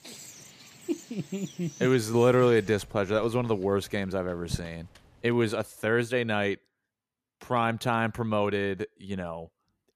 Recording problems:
animal sounds; noticeable; until 5.5 s; 20 dB below the speech

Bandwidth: 14.5 kHz